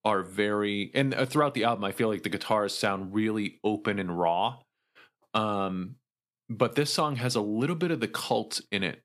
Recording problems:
none

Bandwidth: 15 kHz